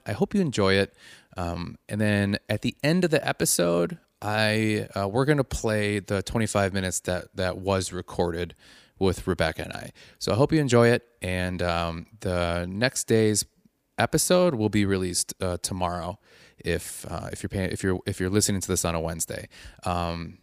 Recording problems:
none

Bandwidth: 15 kHz